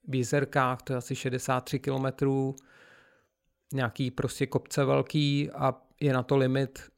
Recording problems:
none

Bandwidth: 16 kHz